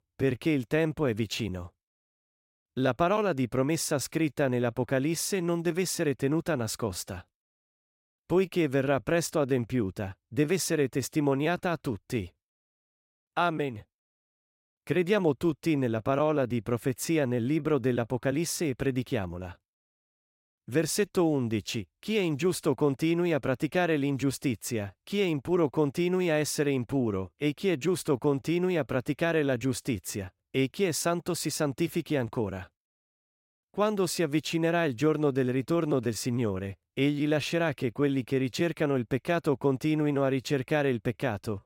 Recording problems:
none

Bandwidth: 16 kHz